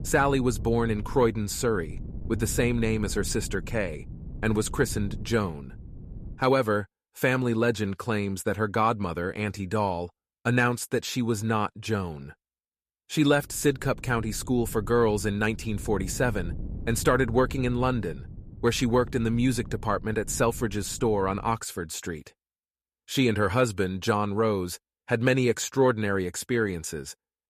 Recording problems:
wind noise on the microphone; occasional gusts; until 6.5 s and from 13 to 22 s; 25 dB below the speech

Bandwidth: 14.5 kHz